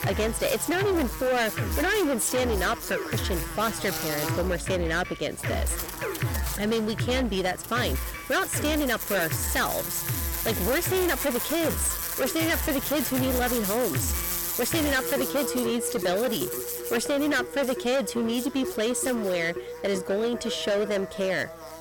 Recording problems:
distortion; heavy; 18% of the sound clipped
electrical hum; loud; throughout; 60 Hz, 8 dB below the speech
background music; loud; throughout; 8 dB below the speech

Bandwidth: 17.5 kHz